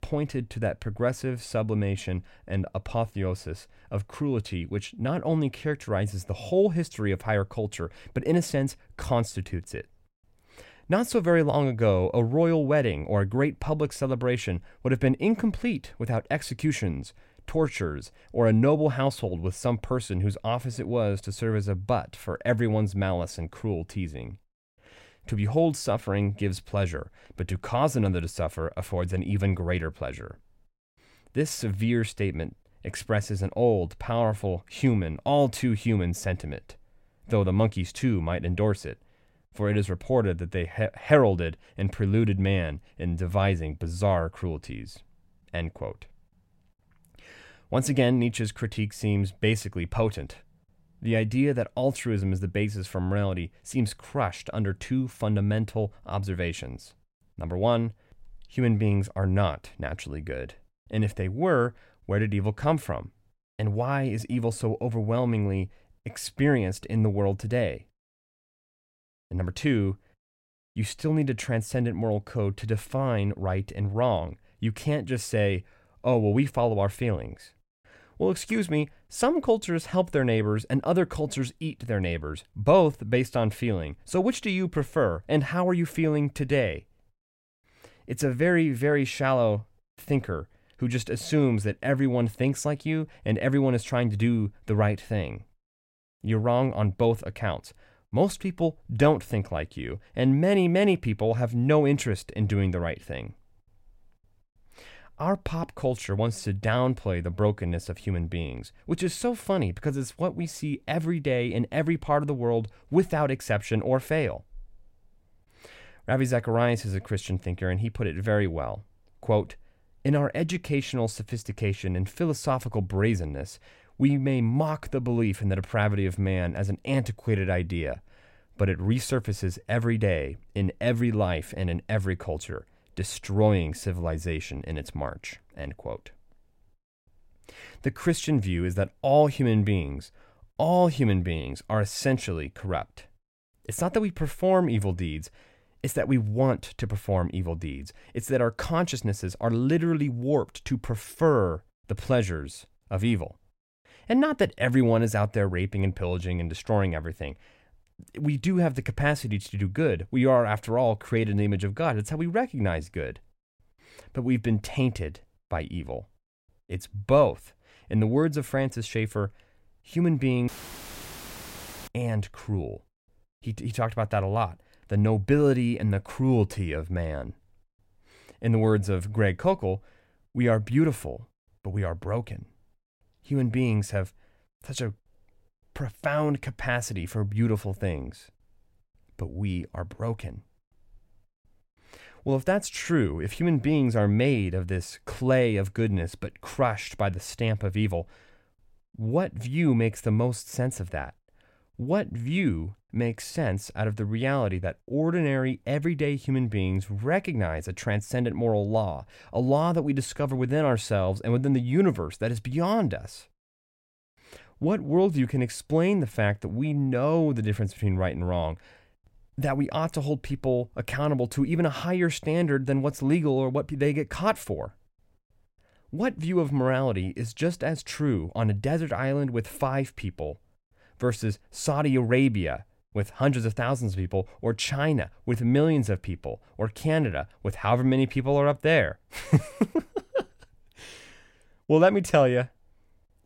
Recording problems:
audio cutting out; filled with static; at 2:50 for 1.5 s

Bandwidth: 16 kHz